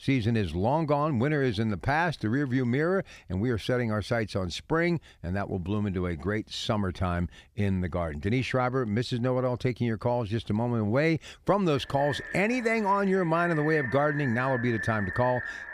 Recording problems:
echo of what is said; strong; from 12 s on; 490 ms later, 8 dB below the speech

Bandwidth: 15 kHz